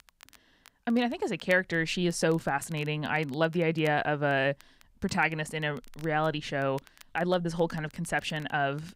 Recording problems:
crackle, like an old record; faint; 25 dB below the speech

